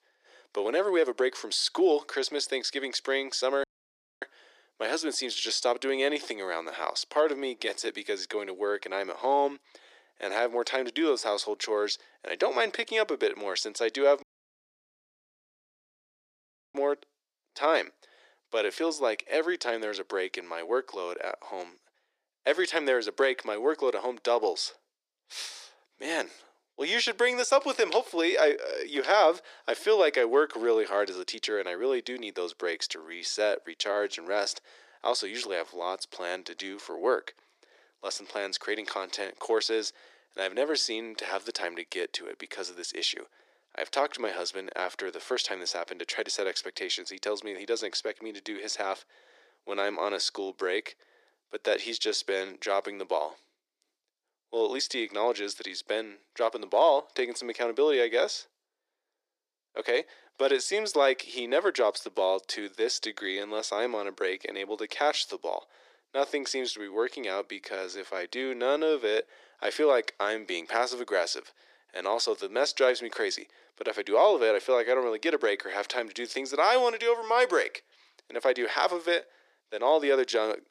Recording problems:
thin; very; fading below 350 Hz
audio cutting out; at 3.5 s for 0.5 s and at 14 s for 2.5 s

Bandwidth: 14.5 kHz